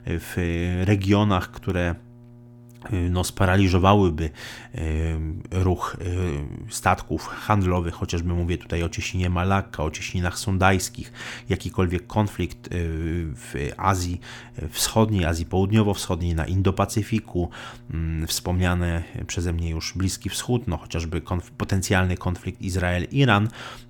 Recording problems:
electrical hum; faint; throughout; 60 Hz, 30 dB below the speech

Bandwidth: 18 kHz